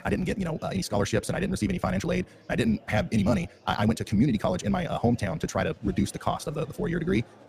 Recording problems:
wrong speed, natural pitch; too fast; 1.6 times normal speed
murmuring crowd; faint; throughout; 25 dB below the speech

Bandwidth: 15 kHz